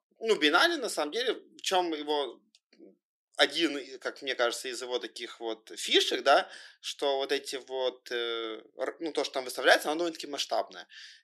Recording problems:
thin; somewhat; fading below 300 Hz

